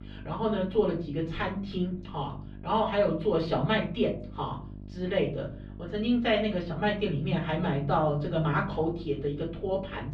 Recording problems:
off-mic speech; far
muffled; slightly; fading above 4 kHz
room echo; very slight; dies away in 0.4 s
electrical hum; faint; throughout; 50 Hz, 25 dB below the speech

